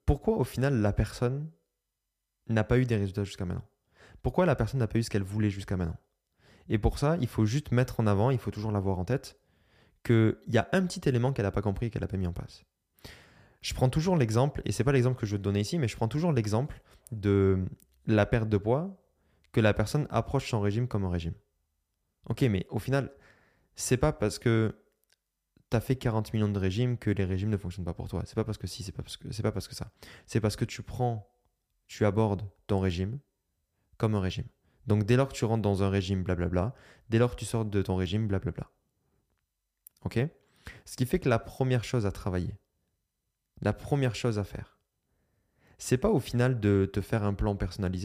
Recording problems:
abrupt cut into speech; at the end

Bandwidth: 15 kHz